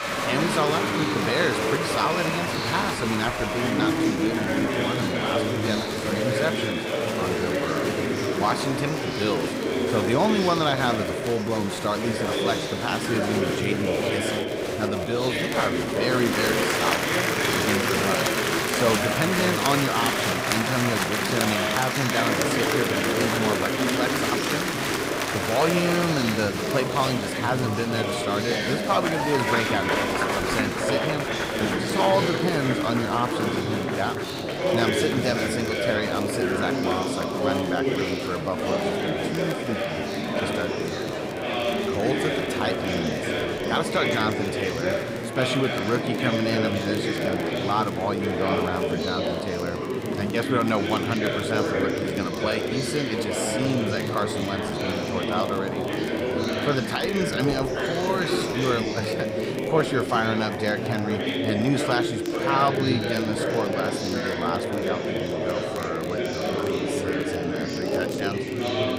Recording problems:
chatter from many people; very loud; throughout; 2 dB above the speech
crackle, like an old record; noticeable; 20 dB below the speech

